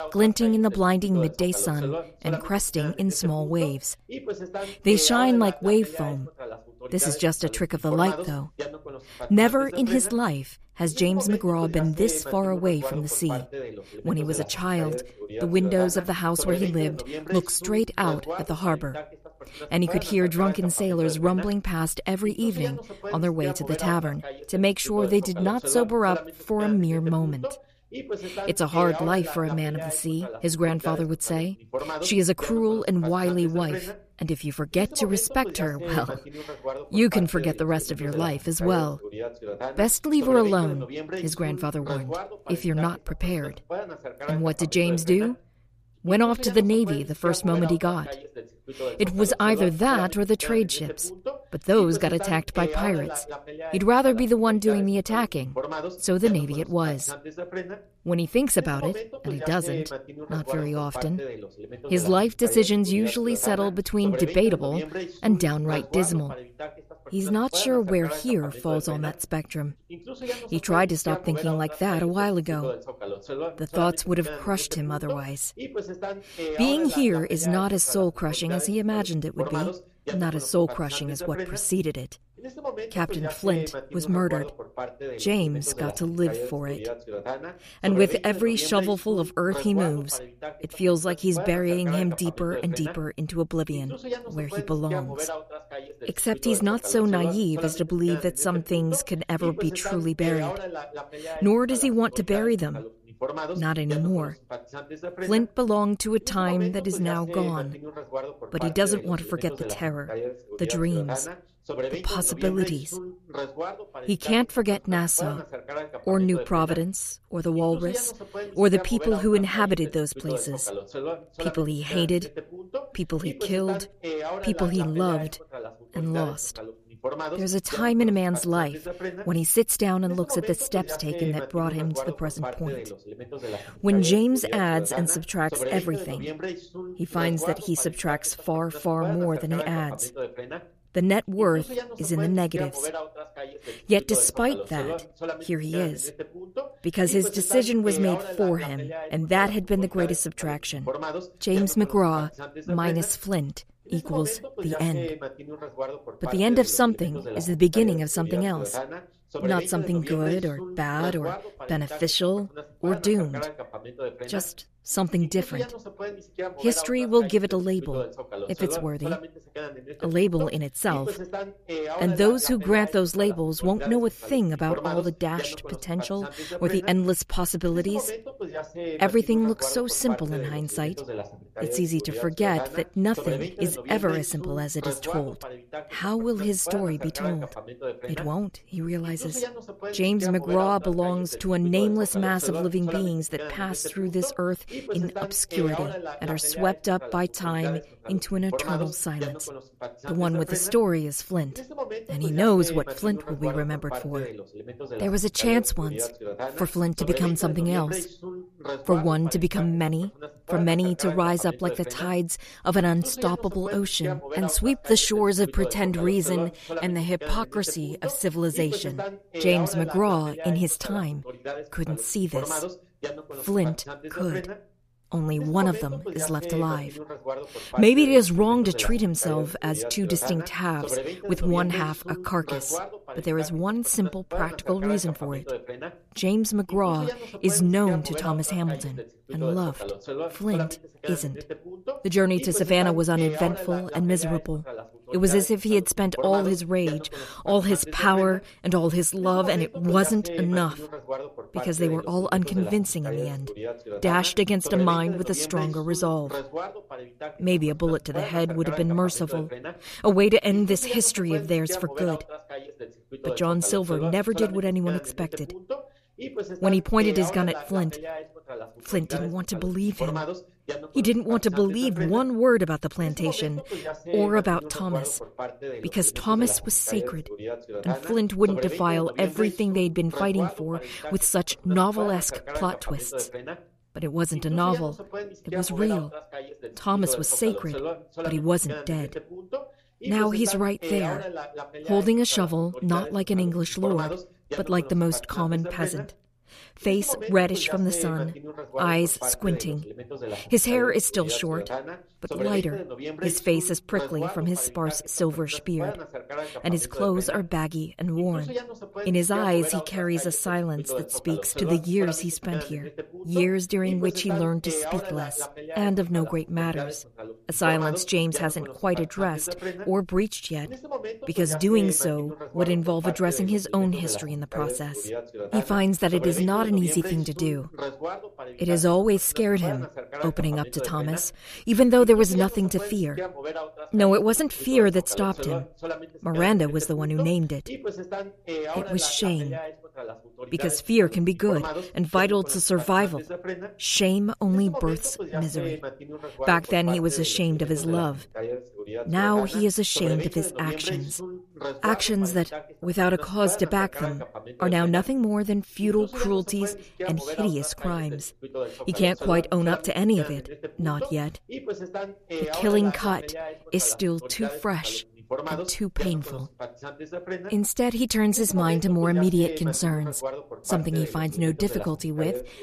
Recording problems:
voice in the background; noticeable; throughout; 10 dB below the speech

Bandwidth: 14.5 kHz